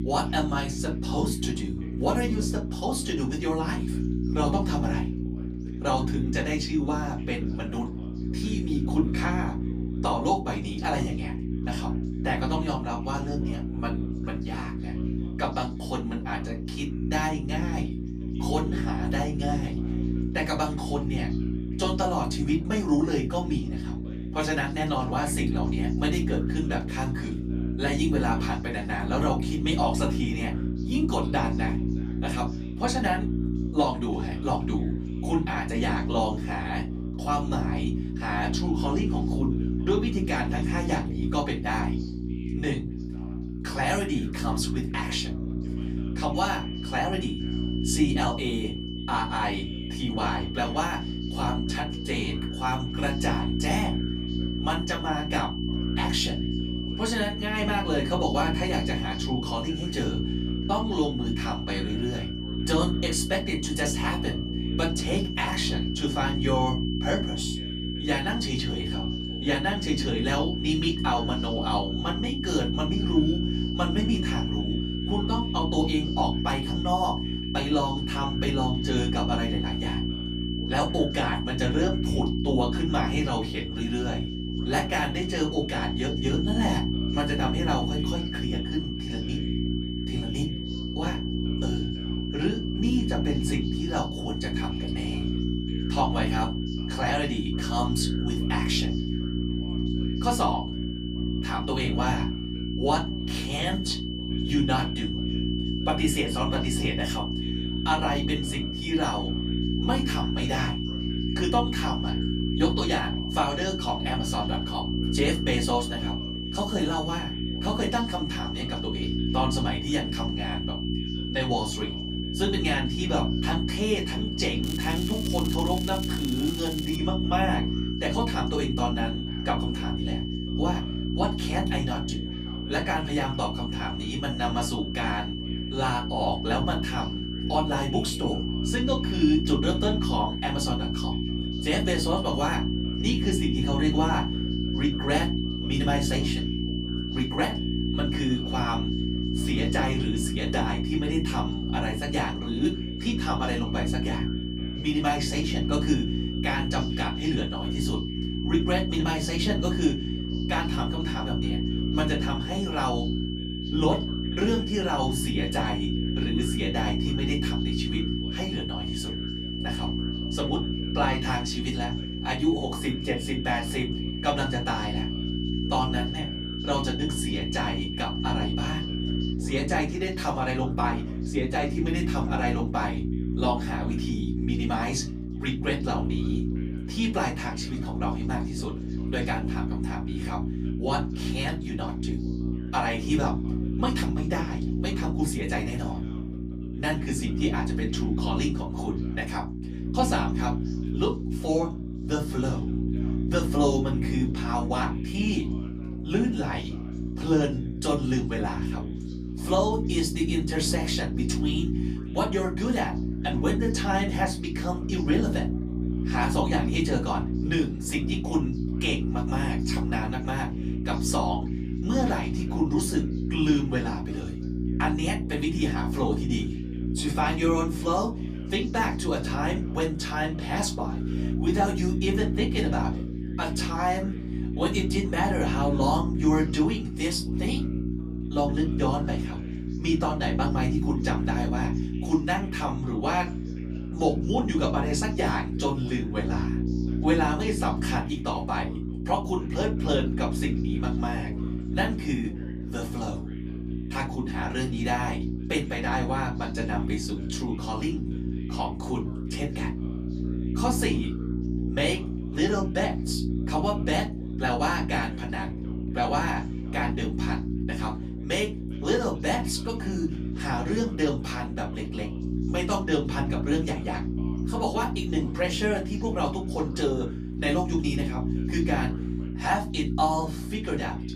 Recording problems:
off-mic speech; far
room echo; very slight; dies away in 0.2 s
electrical hum; loud; throughout; 60 Hz, 7 dB below the speech
high-pitched whine; loud; from 46 s to 2:59; 3 kHz, 7 dB below the speech
crackling; noticeable; from 2:05 to 2:07; 10 dB below the speech
background chatter; faint; throughout; 2 voices, 25 dB below the speech

